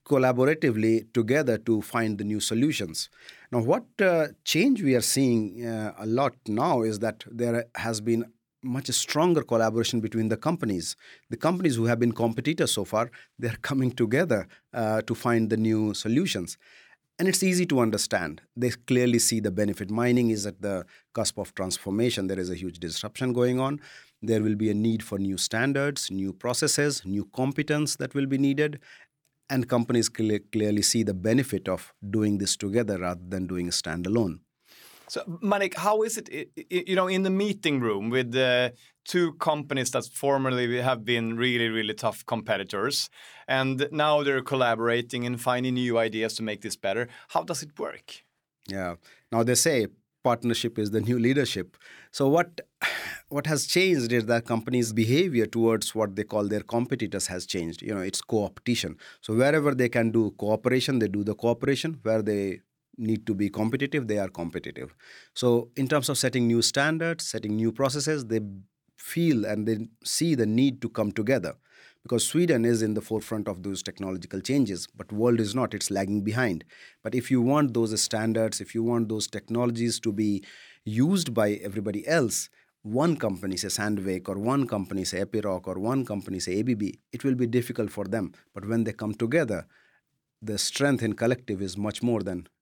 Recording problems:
none

